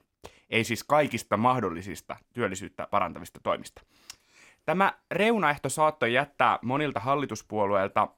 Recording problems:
none

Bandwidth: 17 kHz